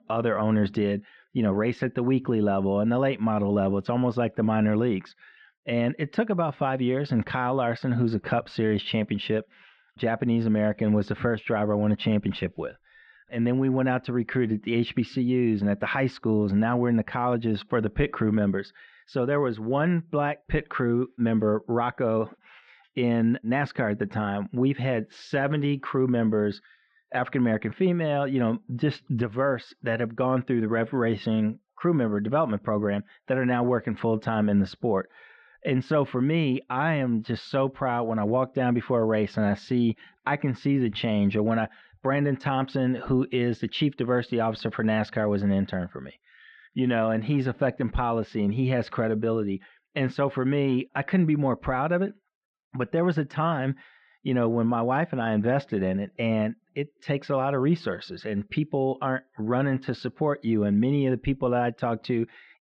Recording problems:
muffled; very; fading above 3 kHz

